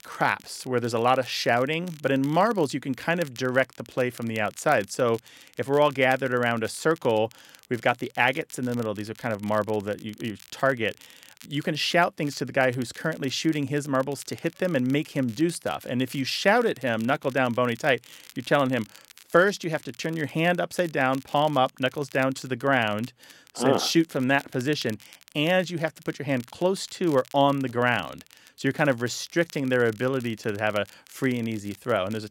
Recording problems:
crackle, like an old record; faint; 25 dB below the speech

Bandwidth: 16 kHz